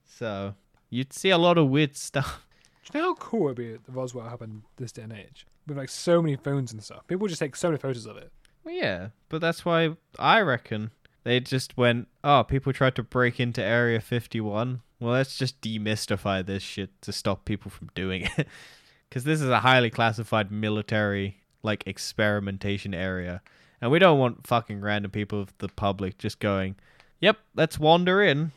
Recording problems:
none

